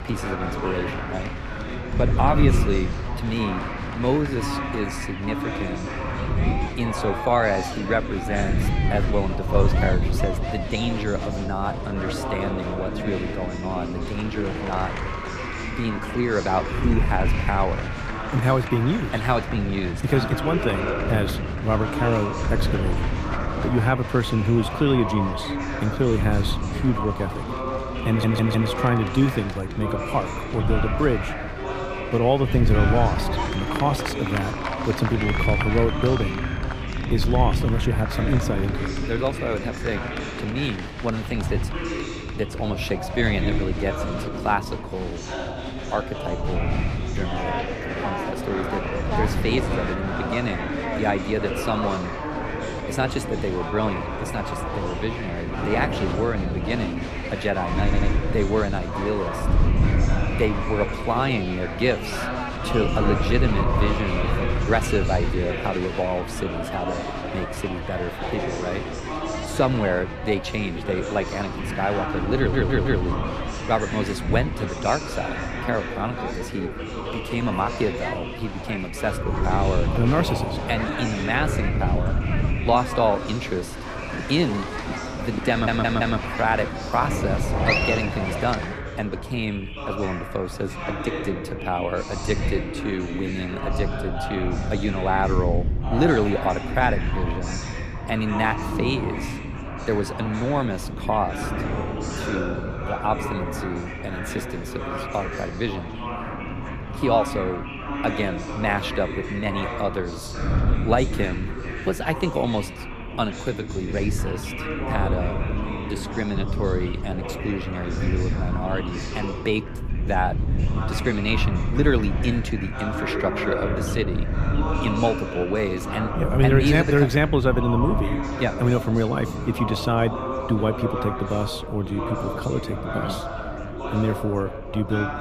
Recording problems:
chatter from many people; loud; throughout; 4 dB below the speech
wind noise on the microphone; occasional gusts; 15 dB below the speech
audio stuttering; 4 times, first at 28 s

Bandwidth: 15 kHz